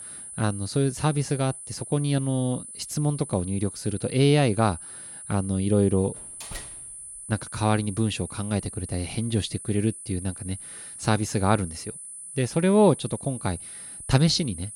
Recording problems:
high-pitched whine; noticeable; throughout; 10 kHz, 10 dB below the speech
door banging; faint; at 6 s; peak 15 dB below the speech

